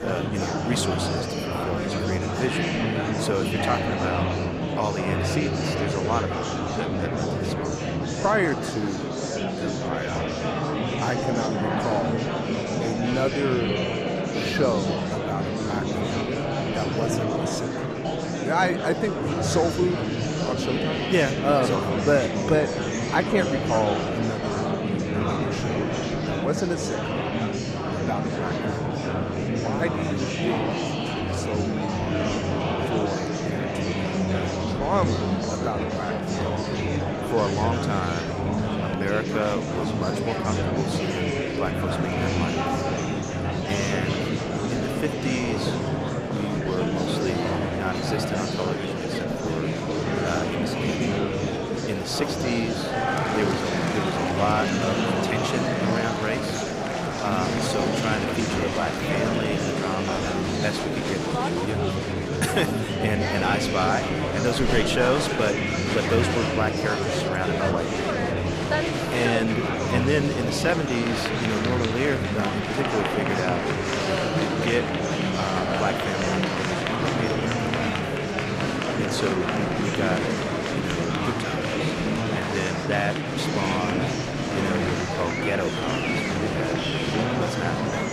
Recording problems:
murmuring crowd; very loud; throughout; 3 dB above the speech

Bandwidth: 15 kHz